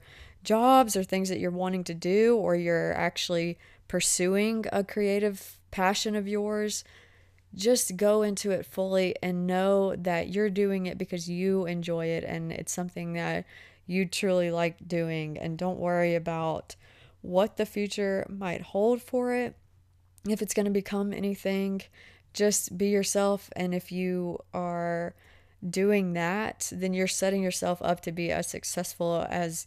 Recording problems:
none

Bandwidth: 14.5 kHz